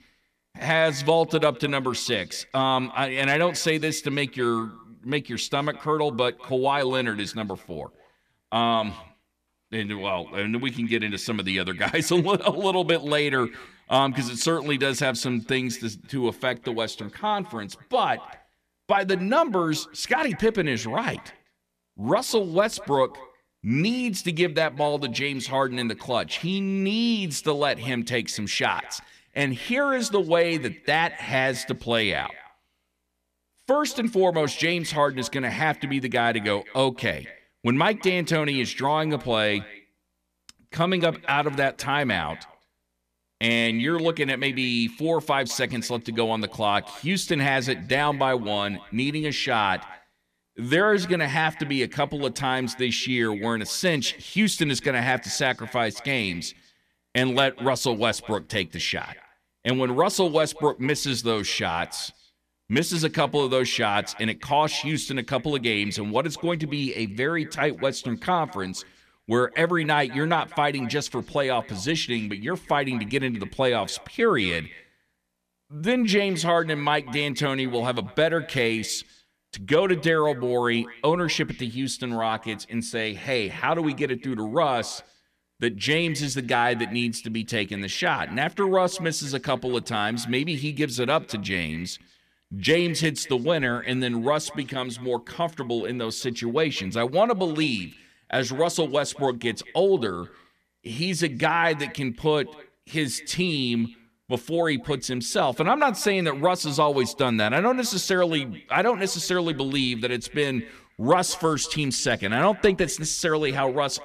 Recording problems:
echo of what is said; faint; throughout; 200 ms later, 20 dB below the speech

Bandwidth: 14.5 kHz